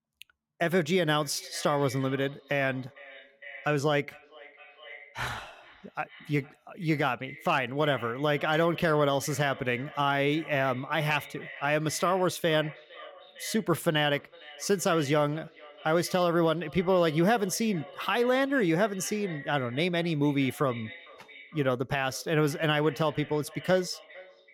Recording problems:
echo of what is said; faint; throughout; 460 ms later, 20 dB below the speech

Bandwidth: 17 kHz